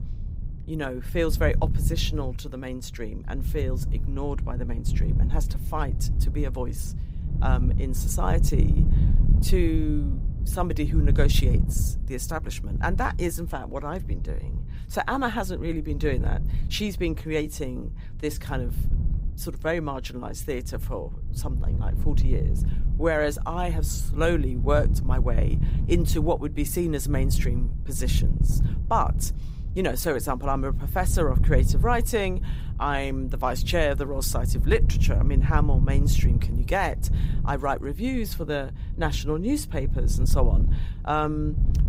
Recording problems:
wind noise on the microphone; occasional gusts; 15 dB below the speech

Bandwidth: 15.5 kHz